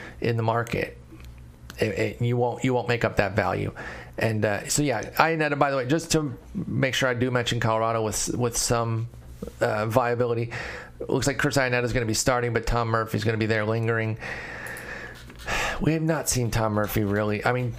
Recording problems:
squashed, flat; heavily

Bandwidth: 15 kHz